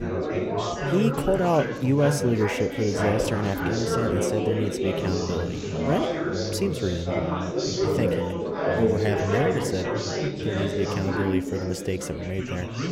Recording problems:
chatter from many people; very loud; throughout; as loud as the speech

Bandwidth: 16 kHz